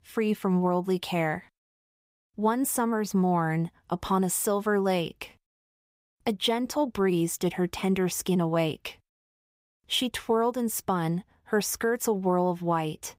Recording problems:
none

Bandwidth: 15.5 kHz